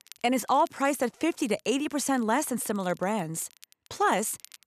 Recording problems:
crackle, like an old record; faint; 25 dB below the speech

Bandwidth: 13.5 kHz